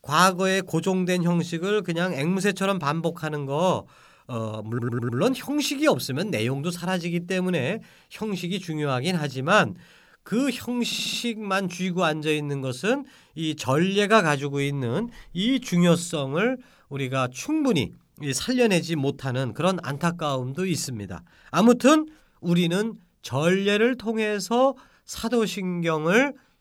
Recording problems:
audio stuttering; at 4.5 s and at 11 s

